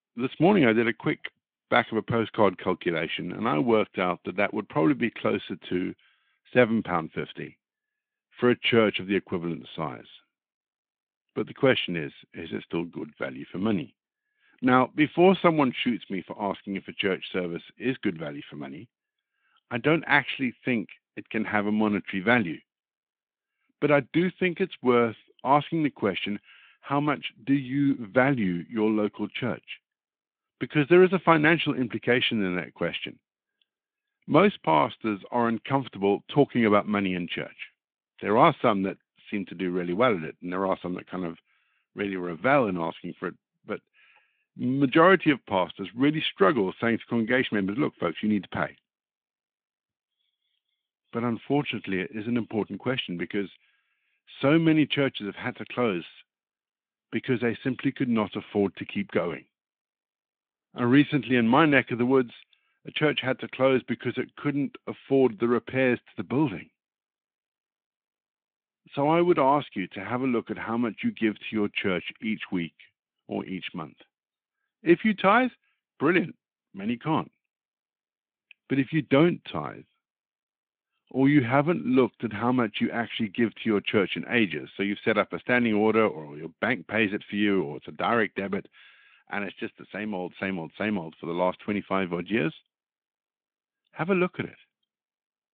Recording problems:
phone-call audio

